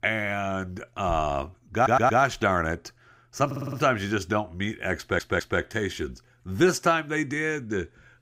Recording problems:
audio stuttering; at 2 s, at 3.5 s and at 5 s

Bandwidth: 15.5 kHz